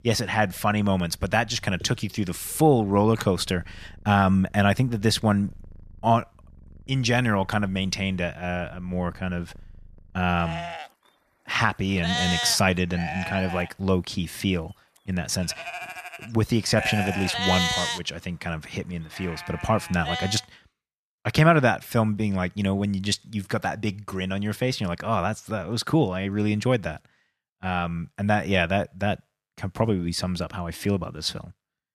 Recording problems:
animal sounds; loud; until 20 s; 5 dB below the speech

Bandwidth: 14.5 kHz